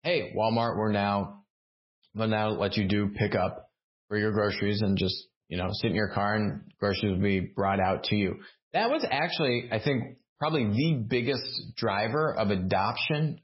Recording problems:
garbled, watery; badly; nothing above 5.5 kHz

